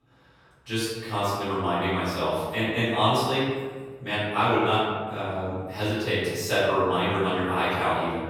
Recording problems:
room echo; strong; dies away in 1.4 s
off-mic speech; far

